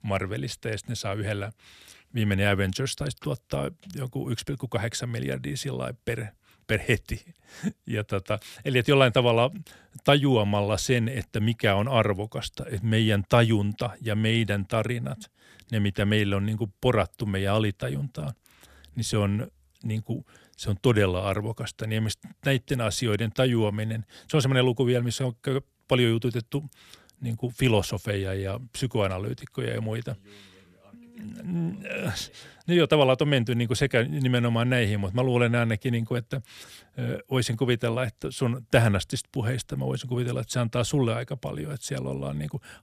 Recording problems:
none

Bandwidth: 14.5 kHz